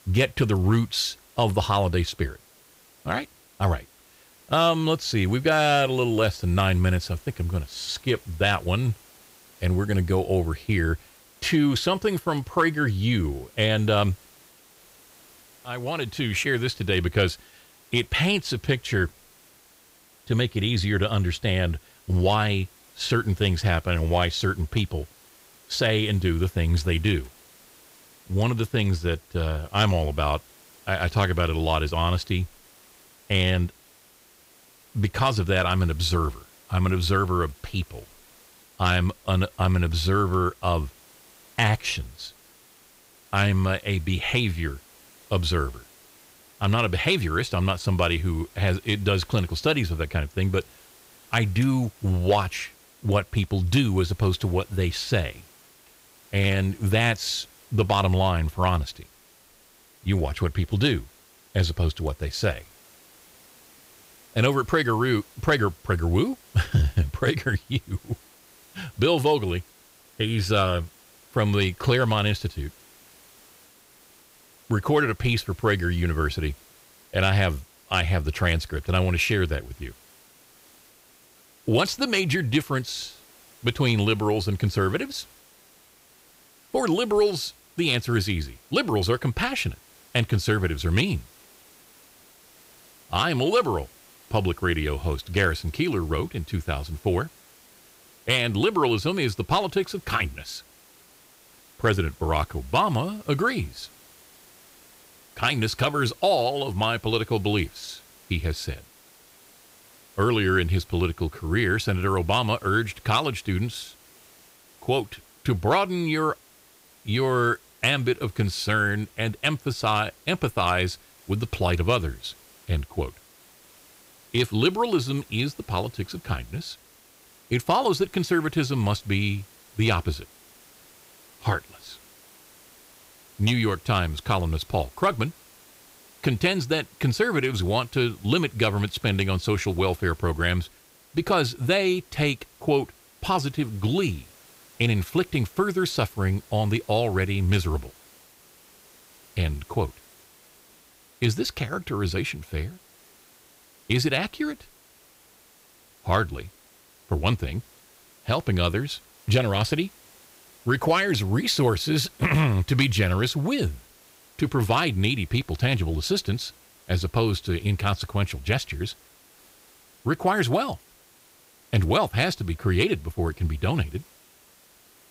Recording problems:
hiss; faint; throughout; 25 dB below the speech

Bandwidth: 15.5 kHz